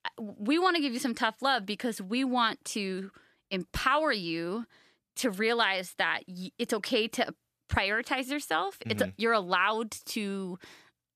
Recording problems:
none

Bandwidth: 14.5 kHz